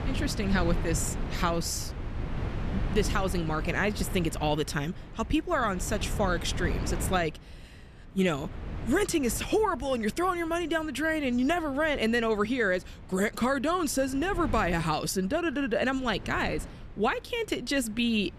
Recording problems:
wind noise on the microphone; occasional gusts; 15 dB below the speech

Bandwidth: 14 kHz